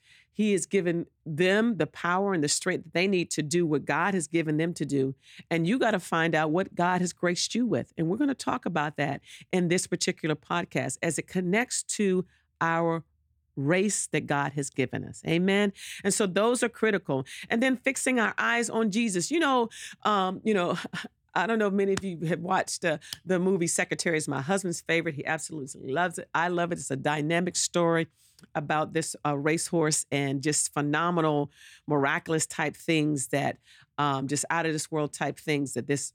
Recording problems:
none

